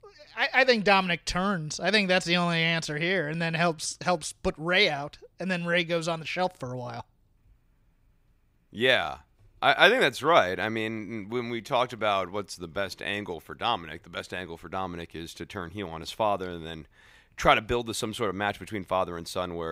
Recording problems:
abrupt cut into speech; at the end

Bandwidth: 15.5 kHz